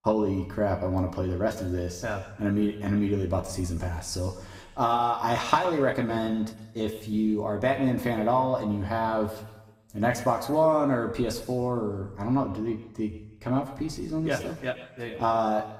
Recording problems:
room echo; slight; dies away in 1 s
off-mic speech; somewhat distant

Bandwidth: 15.5 kHz